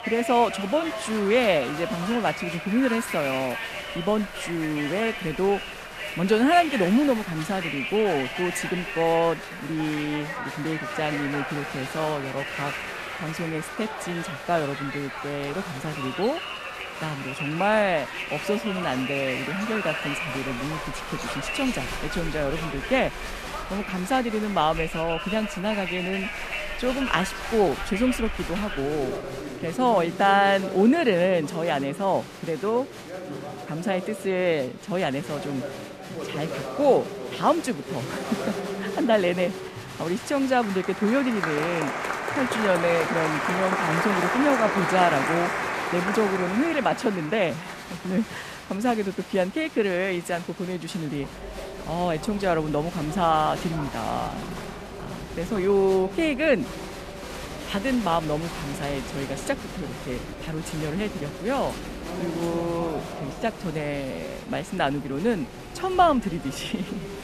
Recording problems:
crowd noise; loud; throughout; 6 dB below the speech

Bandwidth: 14.5 kHz